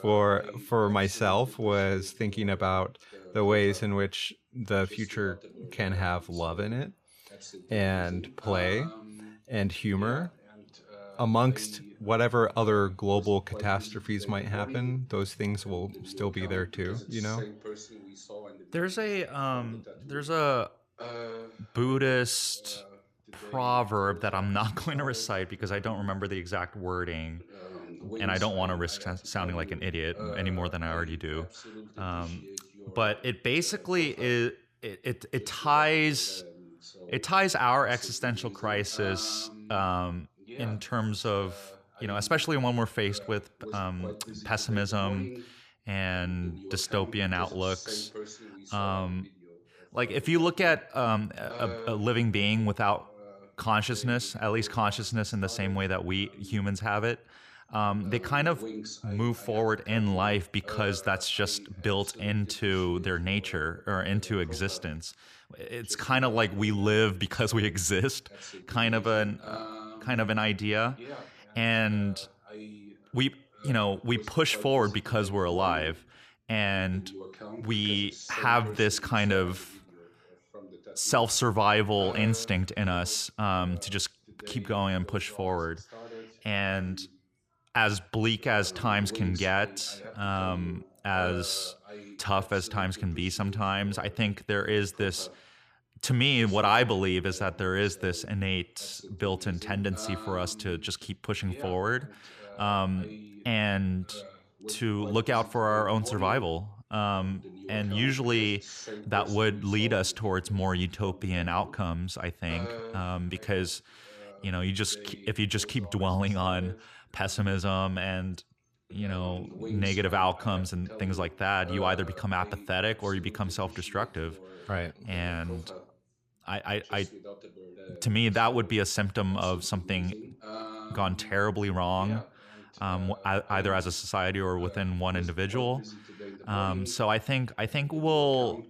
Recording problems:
voice in the background; noticeable; throughout; 15 dB below the speech

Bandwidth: 15 kHz